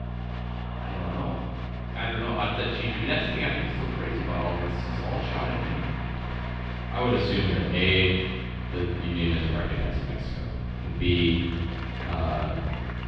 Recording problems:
room echo; strong; dies away in 1.1 s
off-mic speech; far
muffled; slightly; fading above 3.5 kHz
electrical hum; noticeable; throughout; 60 Hz, 15 dB below the speech
crowd noise; noticeable; throughout; 10 dB below the speech

